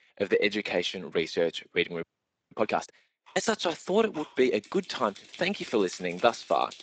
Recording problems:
thin; somewhat; fading below 300 Hz
garbled, watery; slightly; nothing above 7.5 kHz
household noises; faint; throughout; 20 dB below the speech
audio freezing; at 2 s

